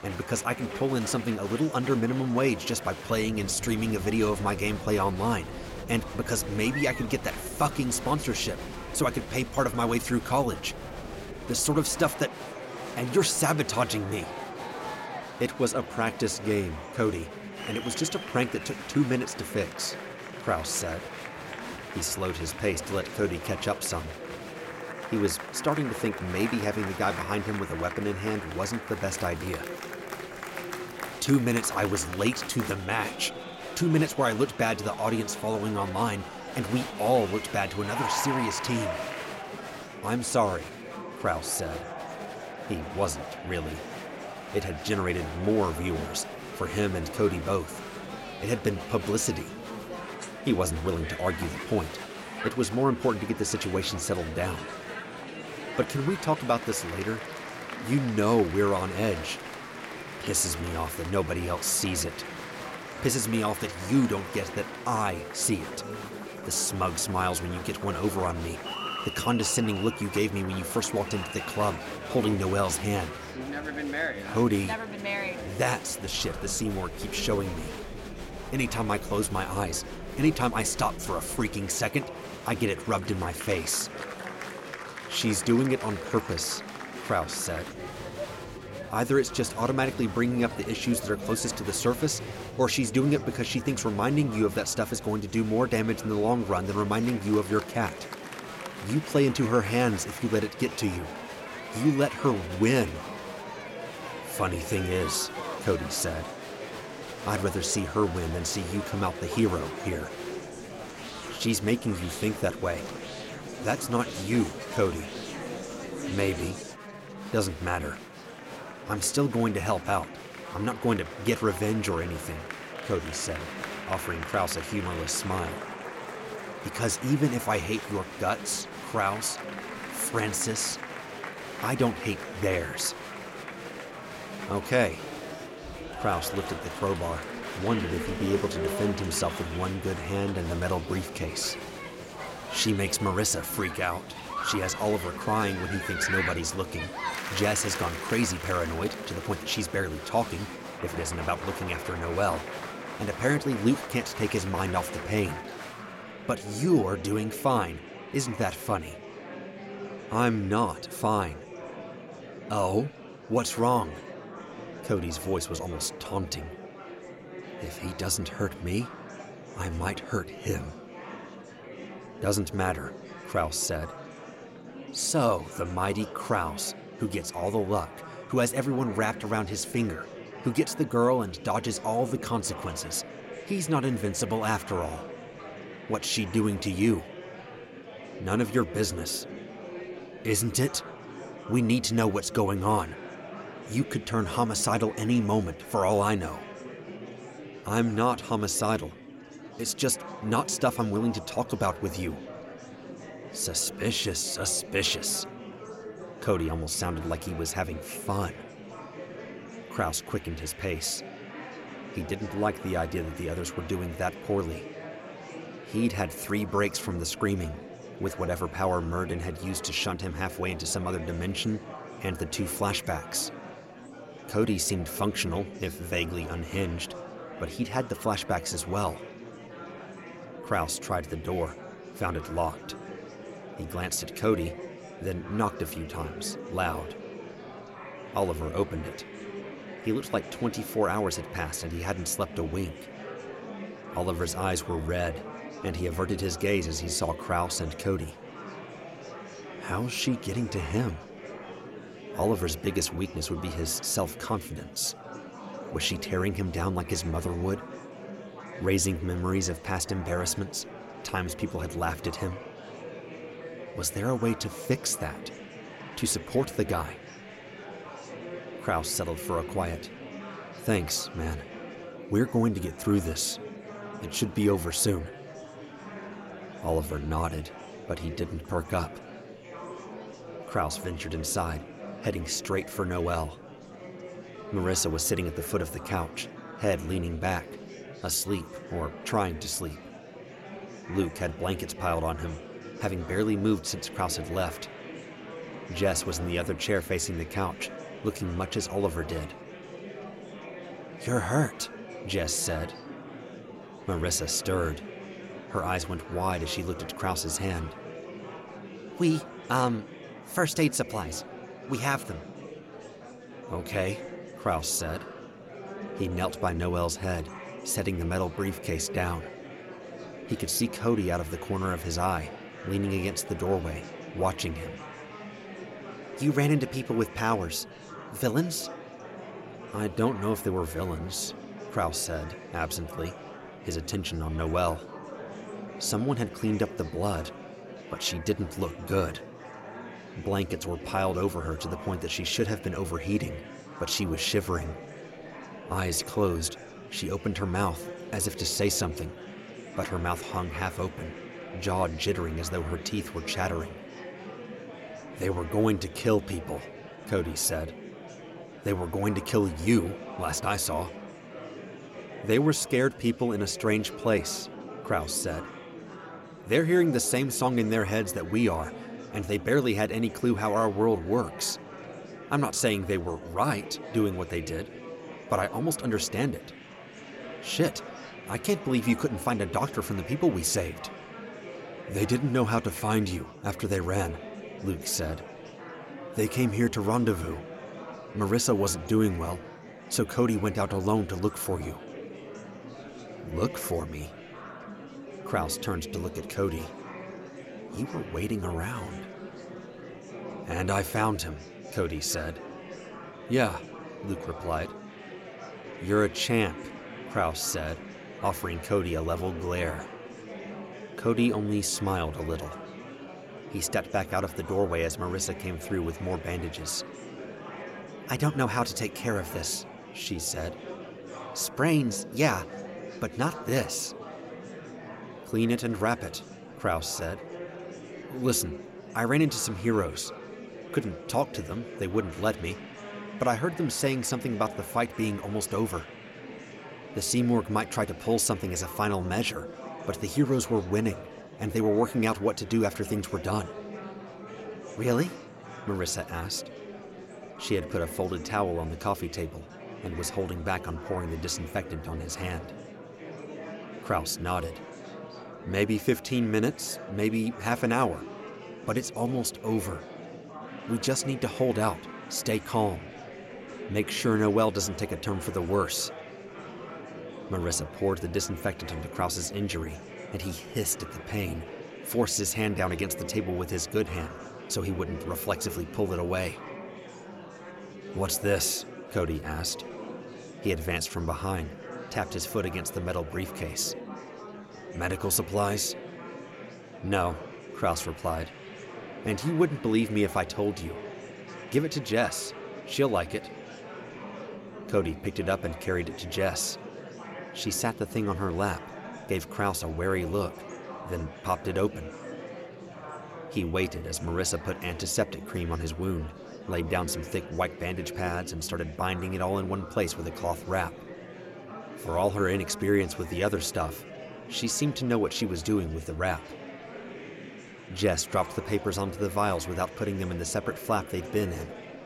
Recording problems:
murmuring crowd; noticeable; throughout; 10 dB below the speech

